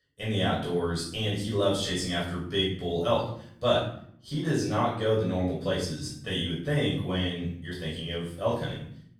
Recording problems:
off-mic speech; far
room echo; noticeable; dies away in 0.6 s

